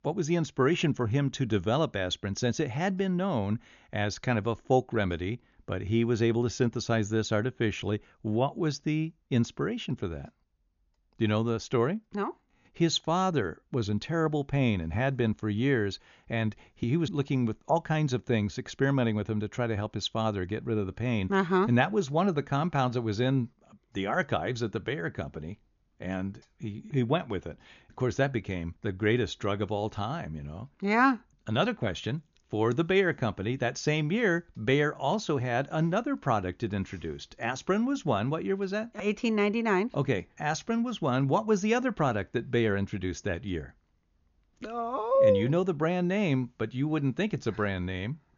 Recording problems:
high frequencies cut off; noticeable; nothing above 7 kHz

